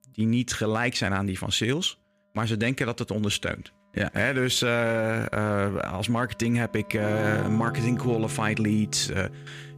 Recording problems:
background music; loud; throughout; 9 dB below the speech

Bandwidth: 15 kHz